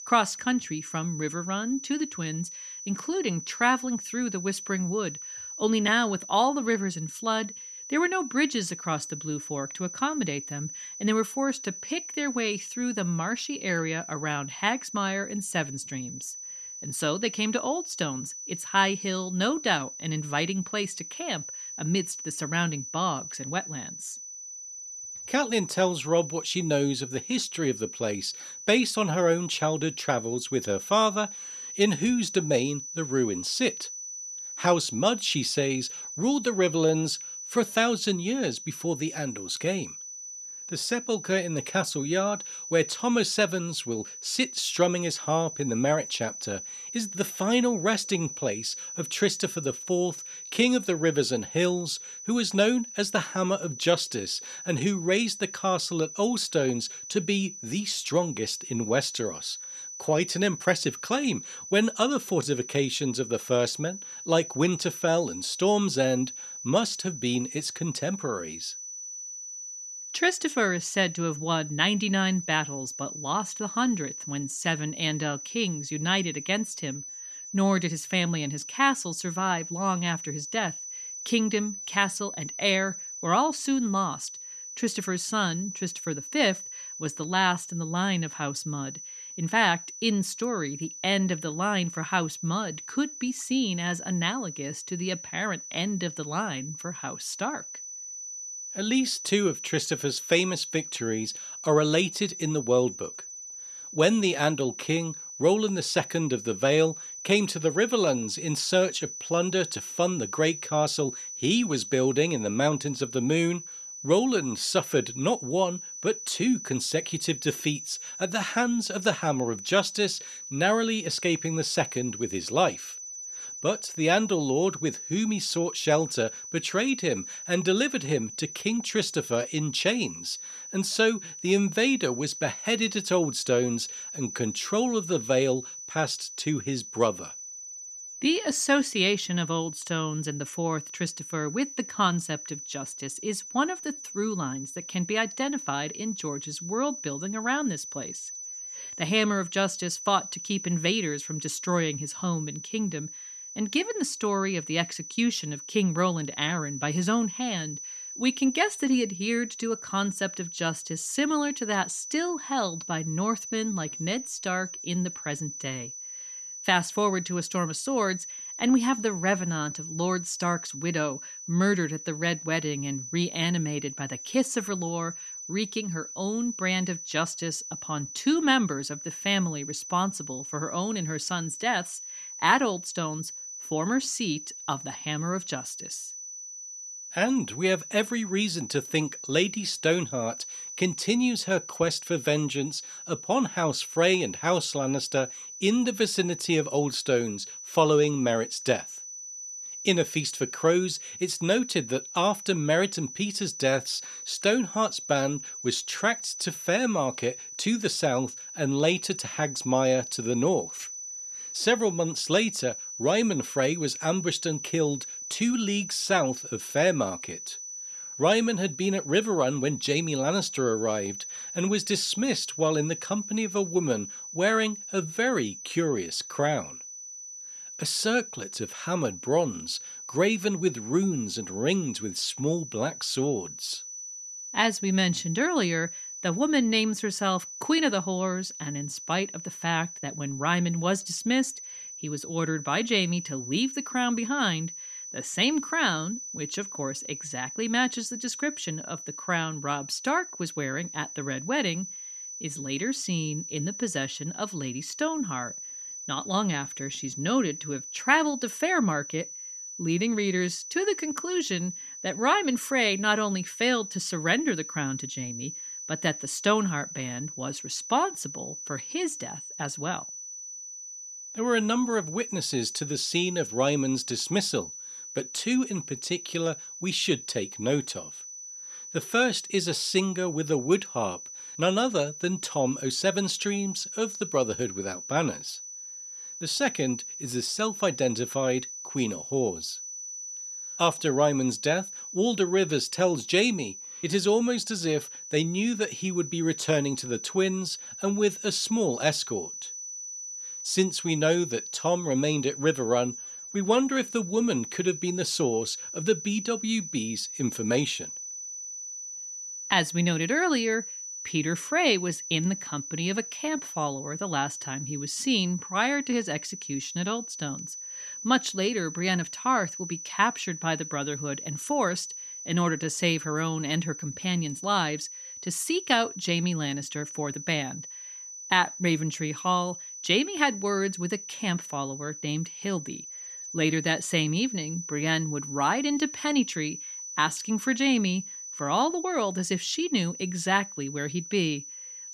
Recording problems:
high-pitched whine; loud; throughout; 6 kHz, 9 dB below the speech

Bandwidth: 13.5 kHz